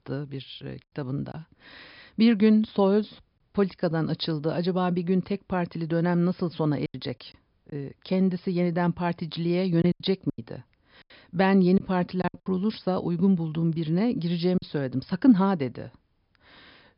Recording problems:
high frequencies cut off; noticeable; nothing above 5.5 kHz
choppy; occasionally; 4% of the speech affected

